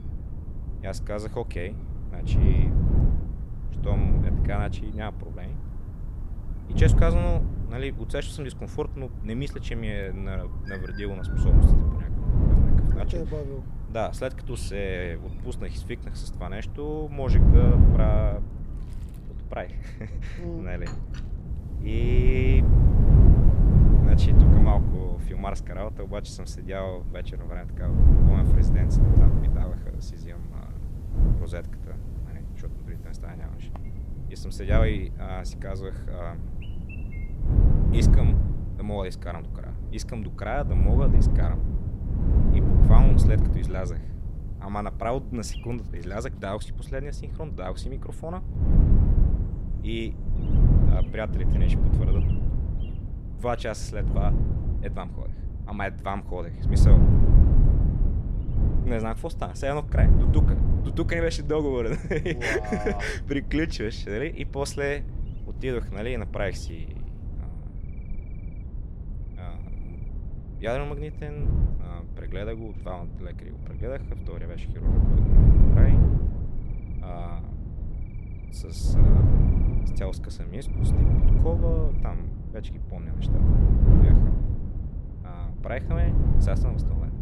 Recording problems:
wind noise on the microphone; heavy; 3 dB below the speech
animal sounds; faint; throughout; 25 dB below the speech

